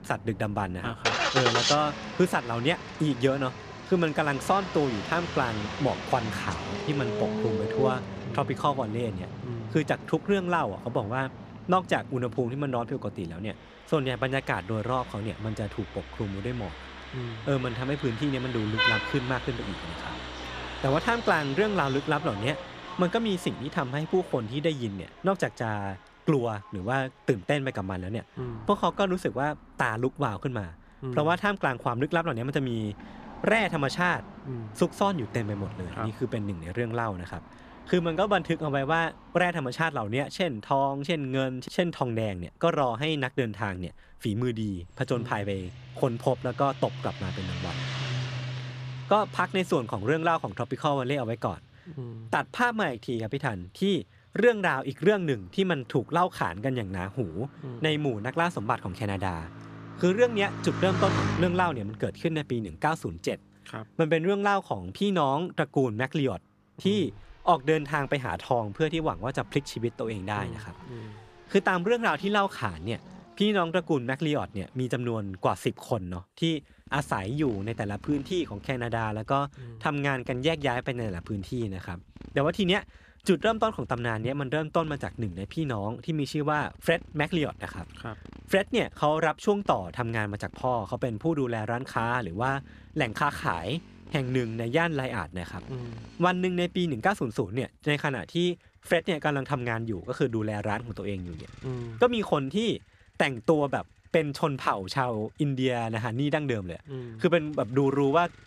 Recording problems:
traffic noise; loud; throughout; 8 dB below the speech

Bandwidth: 14.5 kHz